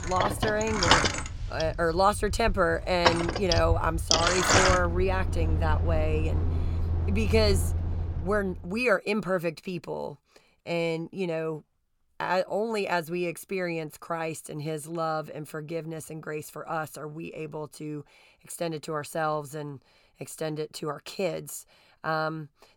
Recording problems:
traffic noise; very loud; until 8 s; 3 dB above the speech

